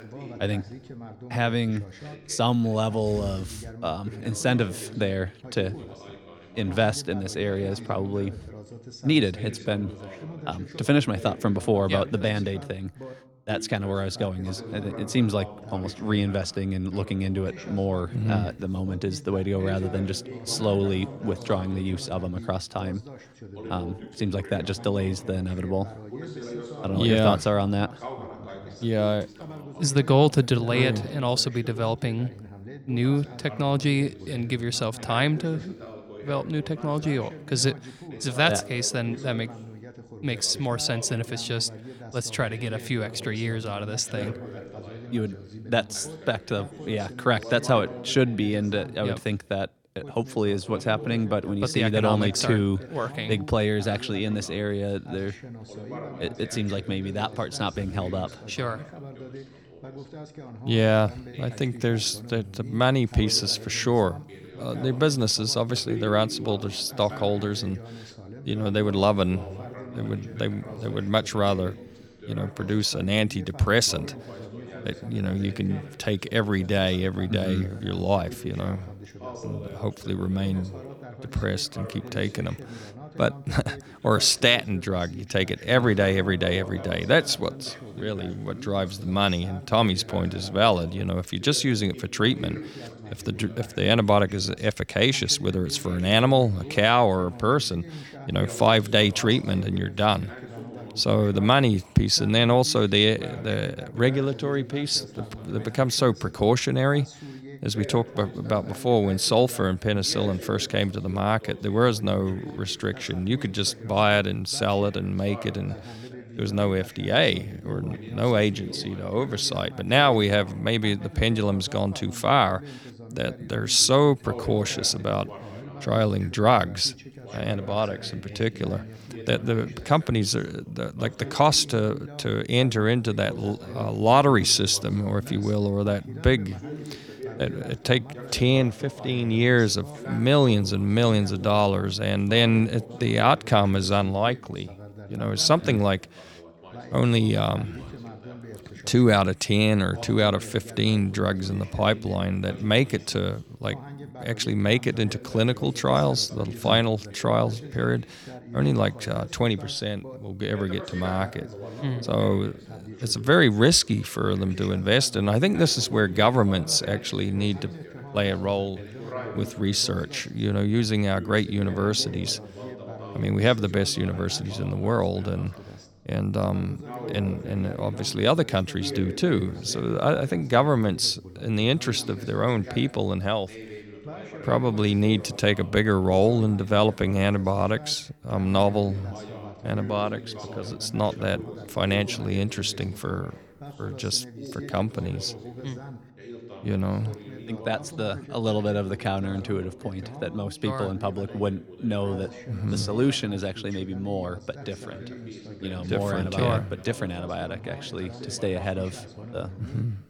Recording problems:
background chatter; noticeable; throughout; 2 voices, 15 dB below the speech

